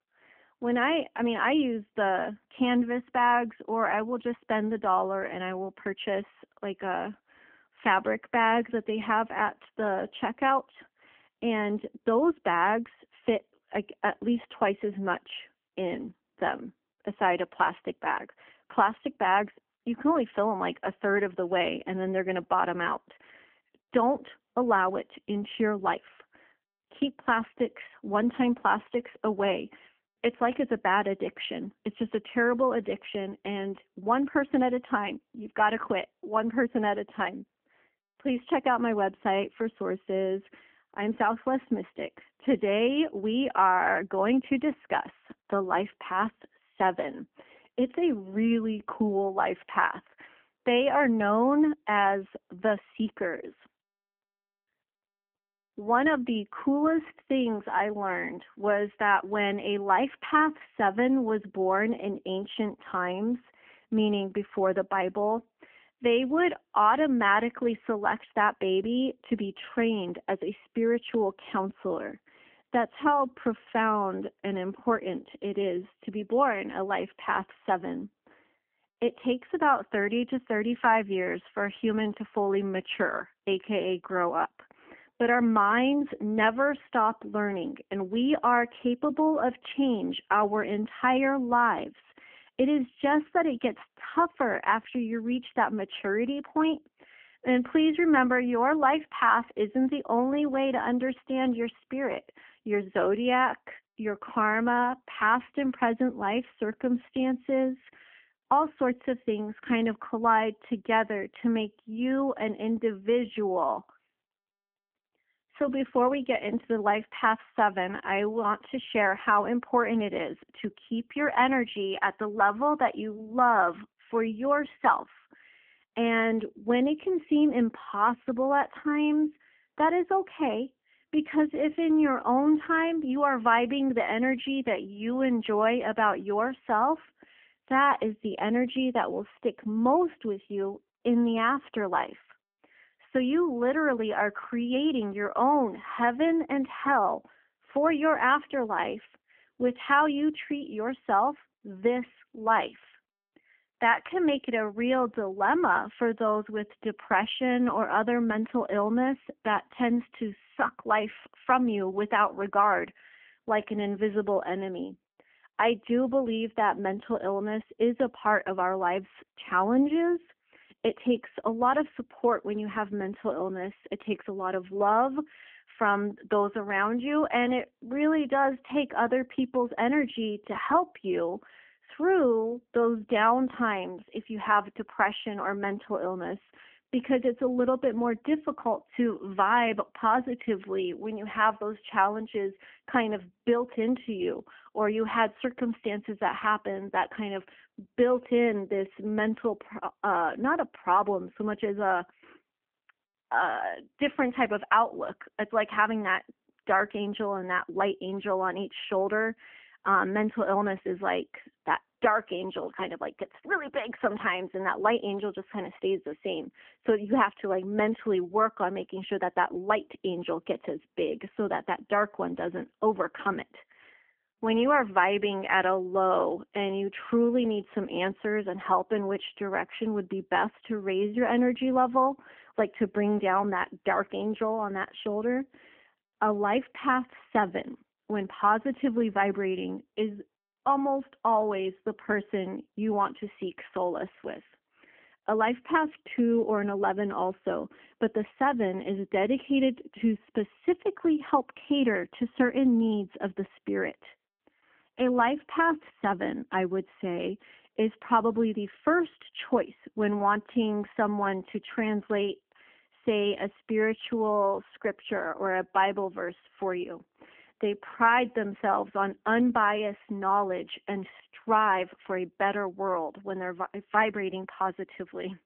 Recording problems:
phone-call audio; nothing above 3 kHz

